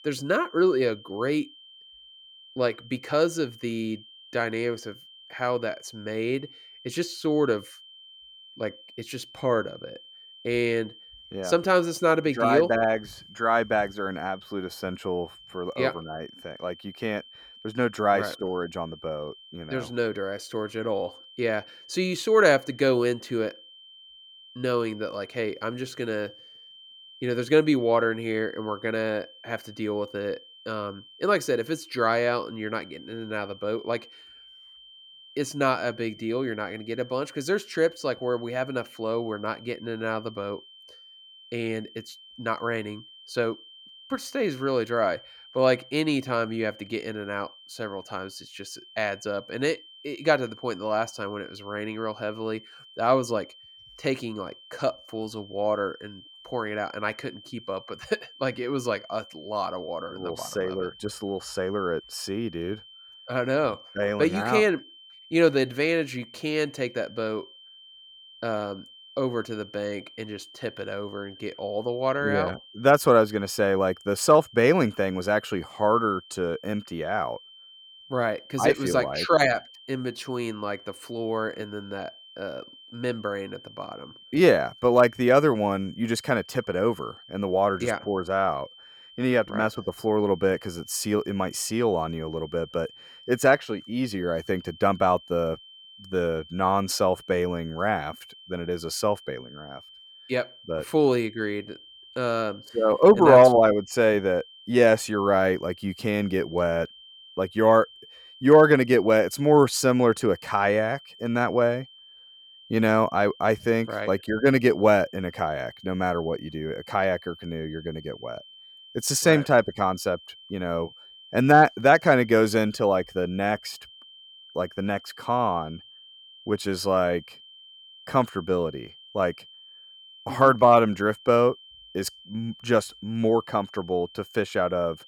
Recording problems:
high-pitched whine; faint; throughout; 3 kHz, 20 dB below the speech

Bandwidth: 17.5 kHz